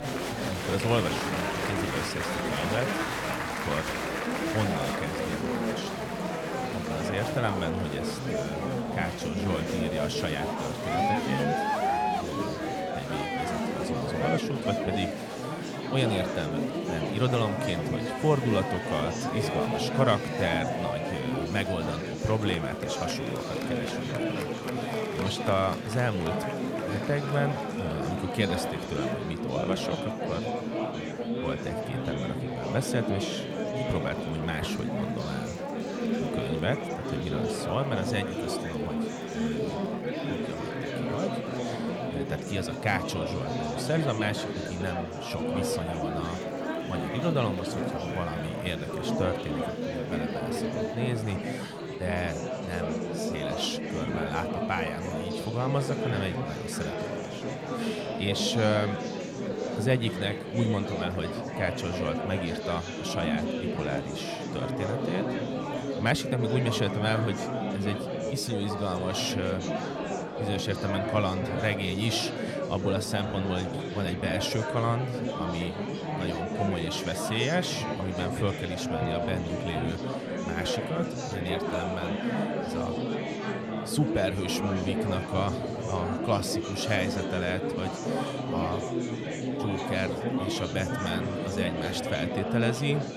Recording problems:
murmuring crowd; very loud; throughout; as loud as the speech

